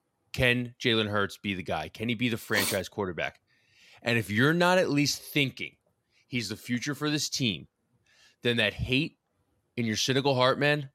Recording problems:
none

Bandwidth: 16 kHz